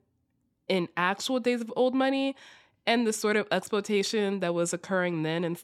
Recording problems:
none

